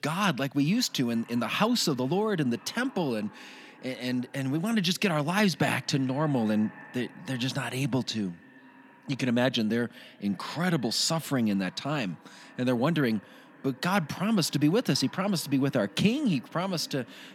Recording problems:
echo of what is said; faint; throughout; 500 ms later, 25 dB below the speech

